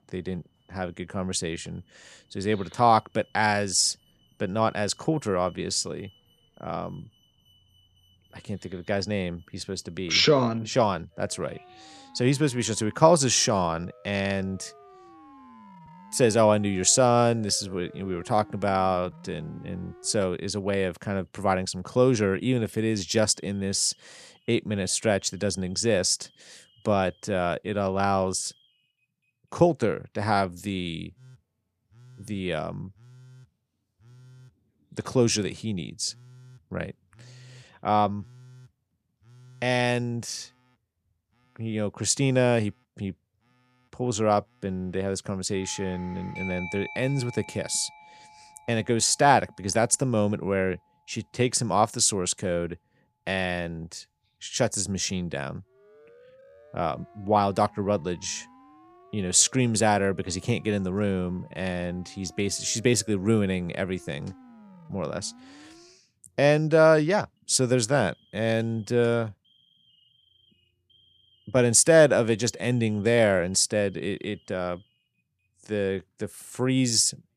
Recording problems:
alarms or sirens; faint; throughout; 25 dB below the speech

